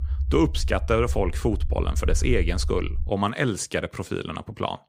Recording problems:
low rumble; faint; until 3 s; 20 dB below the speech

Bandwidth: 15.5 kHz